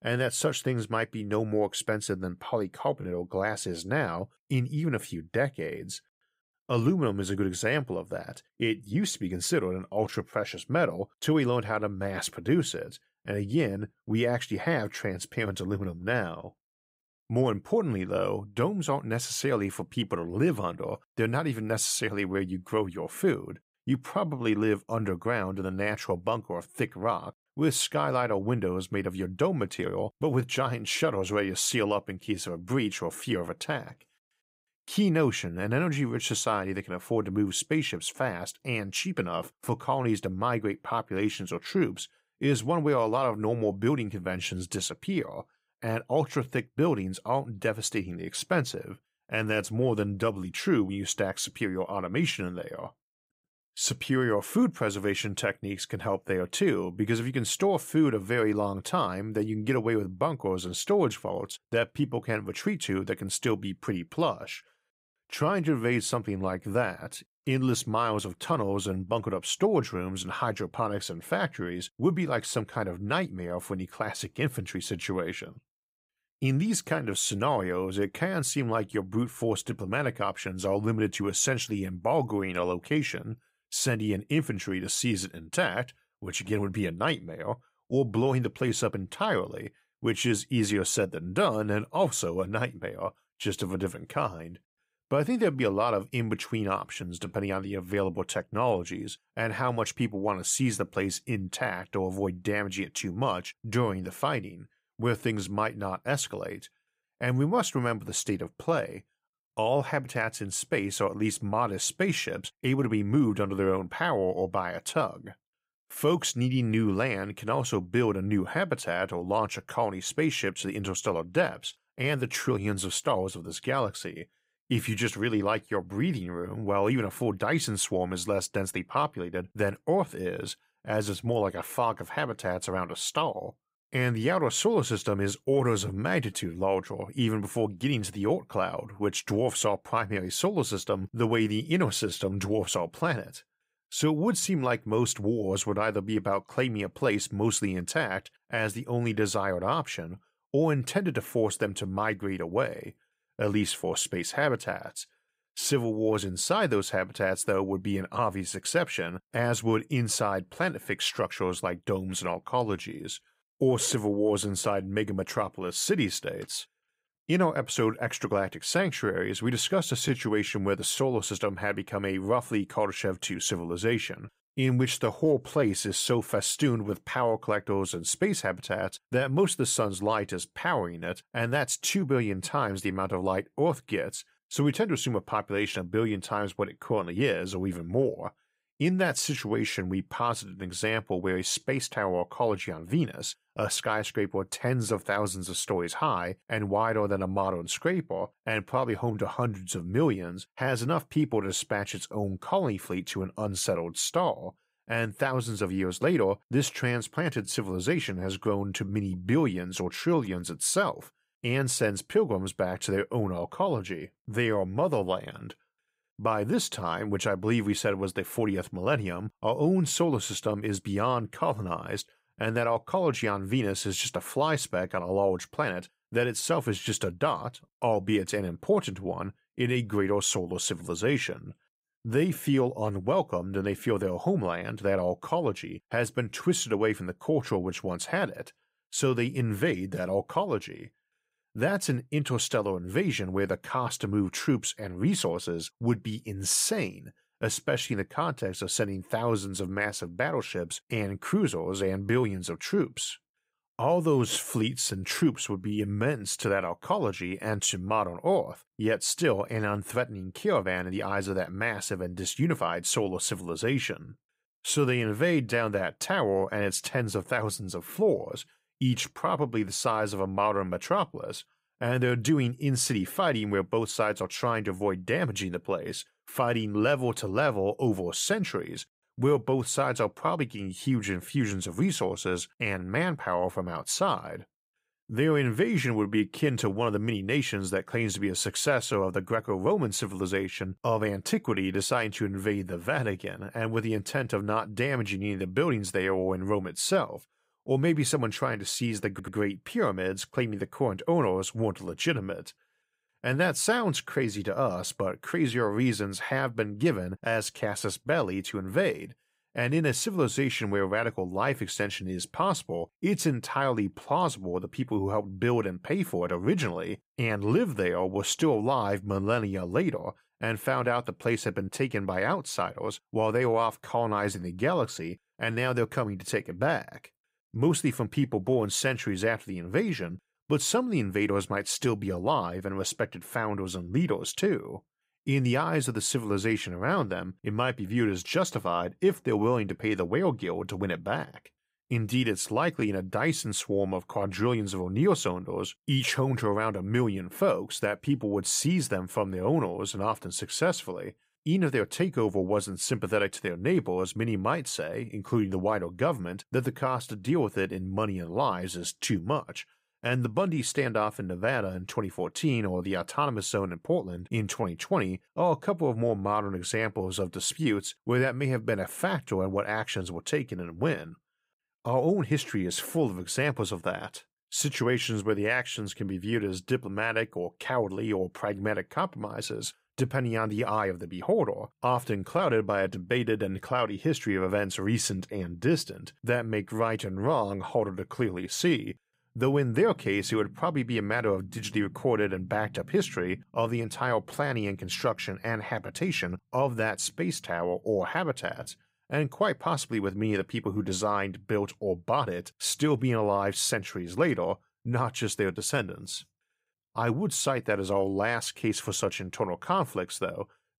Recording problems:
audio stuttering; at 4:59

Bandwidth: 15.5 kHz